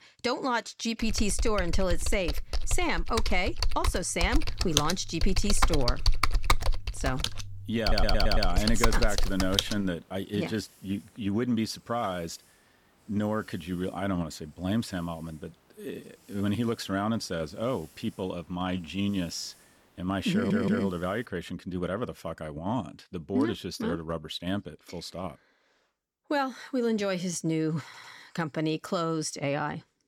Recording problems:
hiss; faint; from 9 to 21 s; 25 dB below the speech
keyboard typing; loud; from 1 to 9.5 s; peak 4 dB above the speech
audio stuttering; at 8 s, at 20 s and at 28 s

